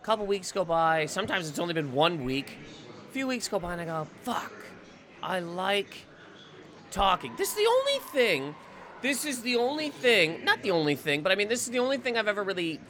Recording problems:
murmuring crowd; noticeable; throughout; 20 dB below the speech

